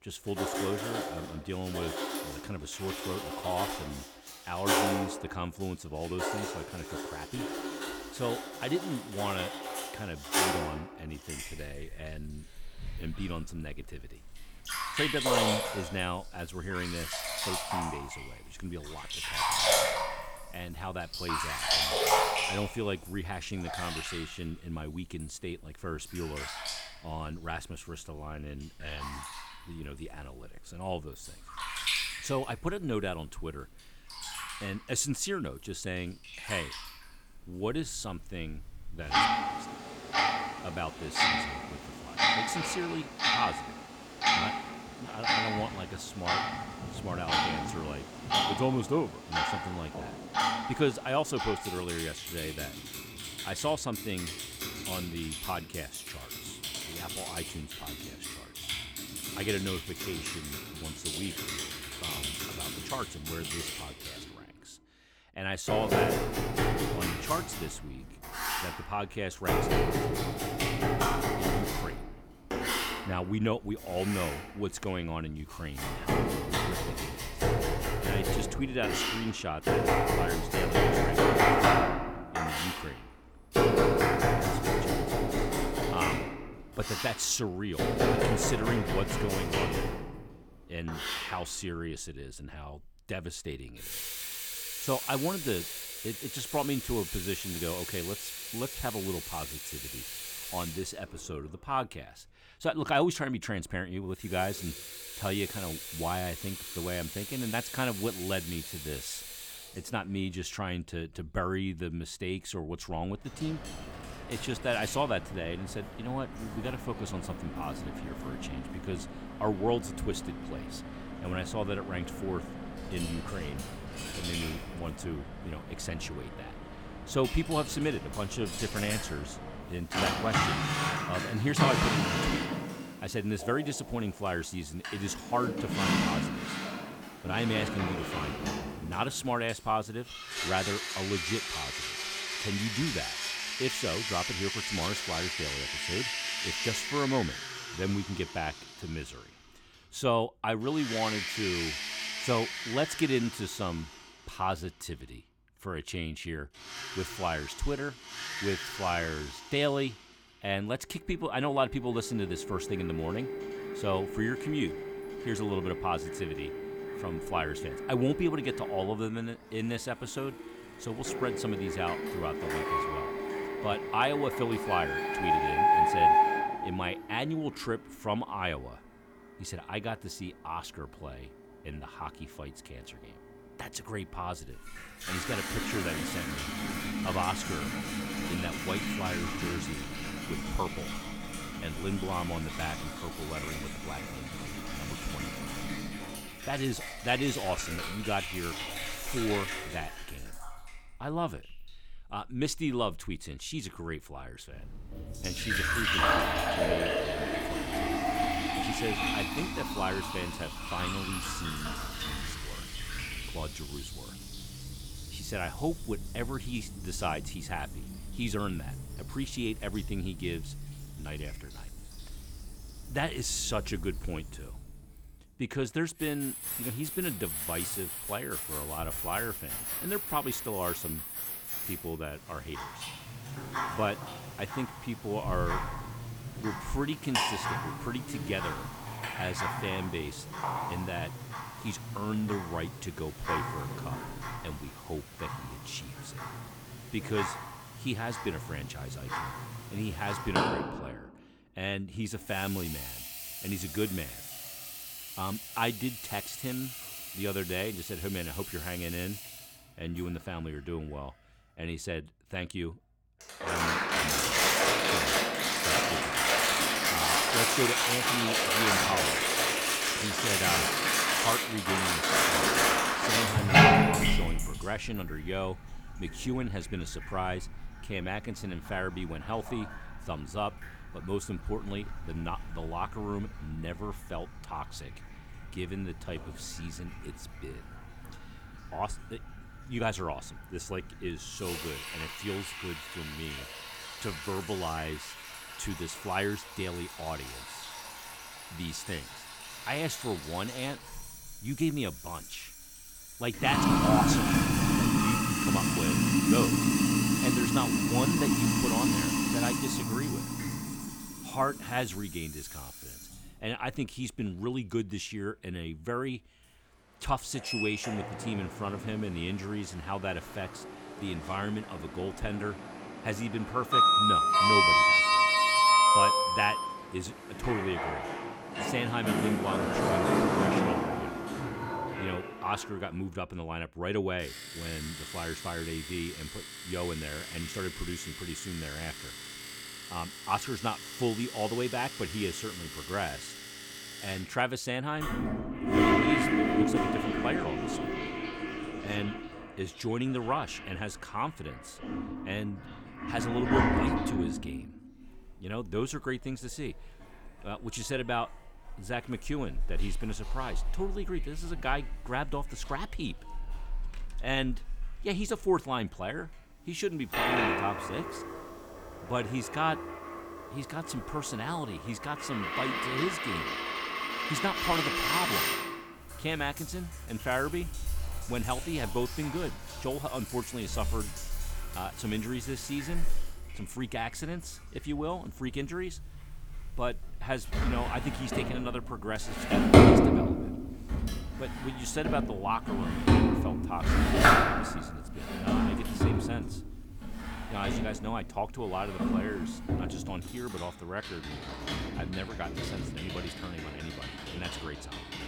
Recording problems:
household noises; very loud; throughout; 4 dB above the speech

